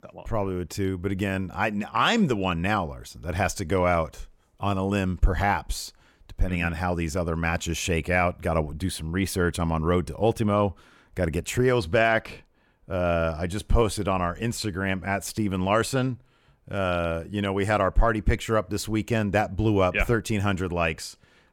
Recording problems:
none

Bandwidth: 17.5 kHz